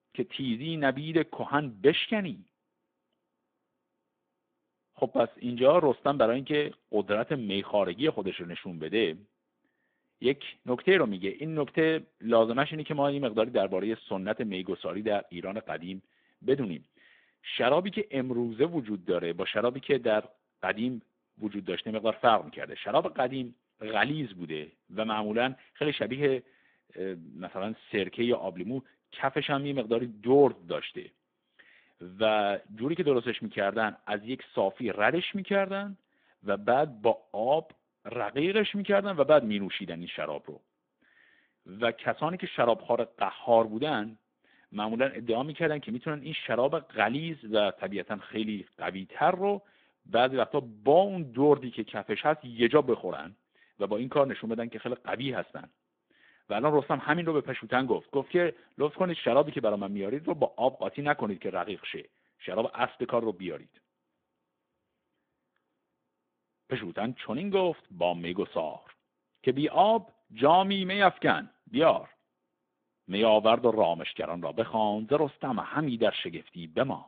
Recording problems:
phone-call audio

